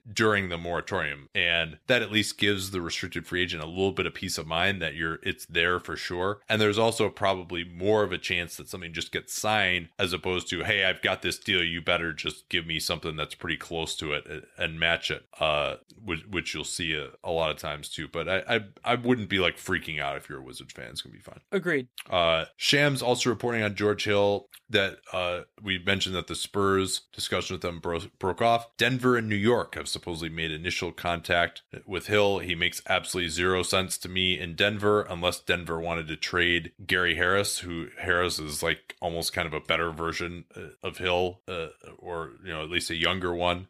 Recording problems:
none

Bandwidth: 15 kHz